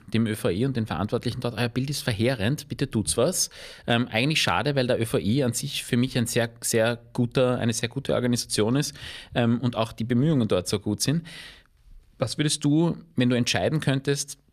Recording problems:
none

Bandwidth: 14.5 kHz